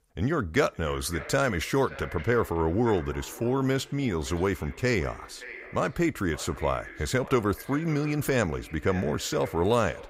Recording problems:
echo of what is said; noticeable; throughout; 570 ms later, 15 dB below the speech

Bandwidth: 15.5 kHz